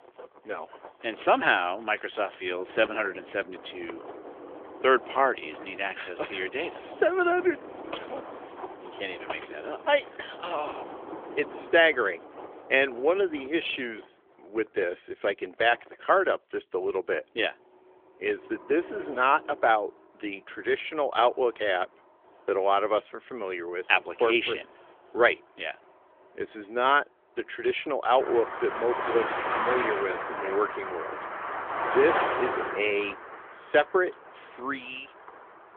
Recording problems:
phone-call audio; nothing above 3.5 kHz
traffic noise; loud; throughout; 8 dB below the speech

